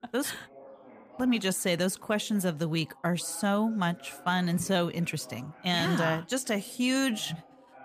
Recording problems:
background chatter; faint; throughout; 2 voices, 20 dB below the speech

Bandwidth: 15 kHz